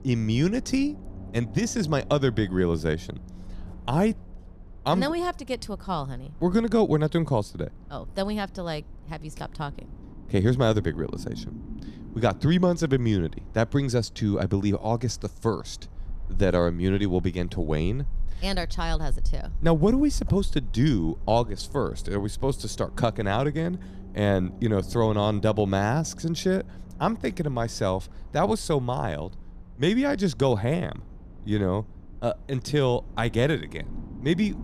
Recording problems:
low rumble; faint; throughout; 25 dB below the speech

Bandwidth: 14.5 kHz